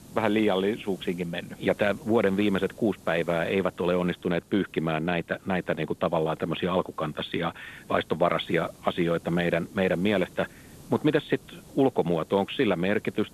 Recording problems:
phone-call audio; nothing above 3.5 kHz
hiss; faint; throughout; 25 dB below the speech

